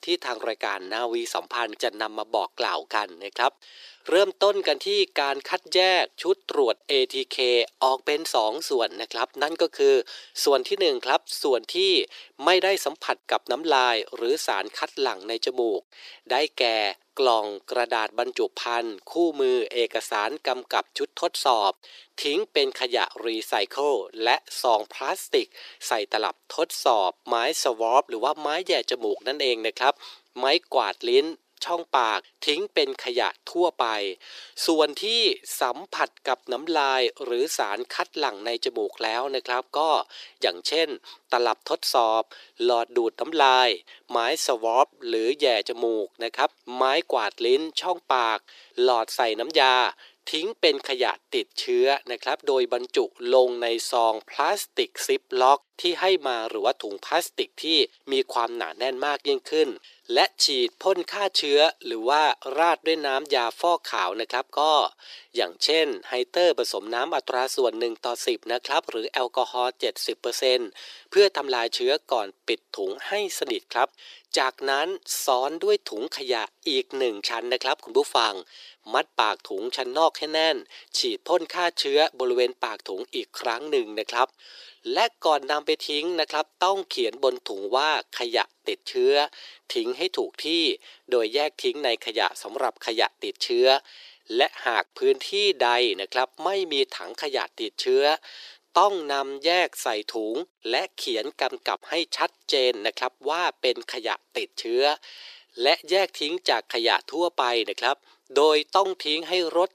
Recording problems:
thin; very; fading below 350 Hz

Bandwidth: 14.5 kHz